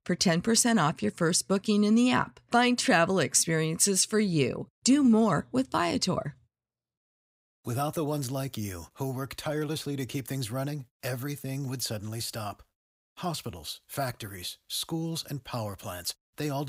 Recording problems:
abrupt cut into speech; at the end

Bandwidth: 15.5 kHz